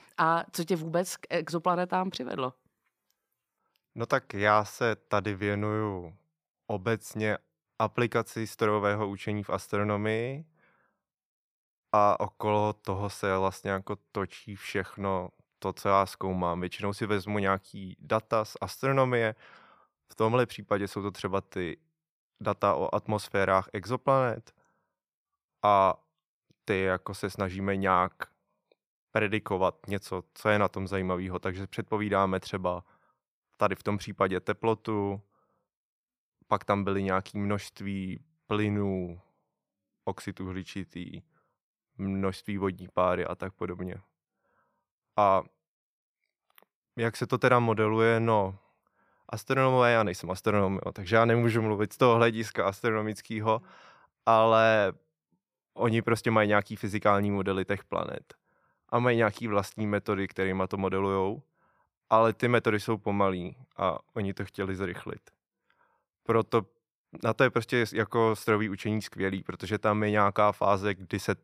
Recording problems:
none

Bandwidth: 15 kHz